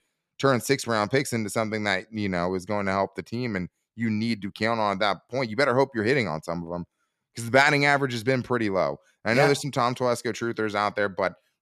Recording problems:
none

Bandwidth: 13.5 kHz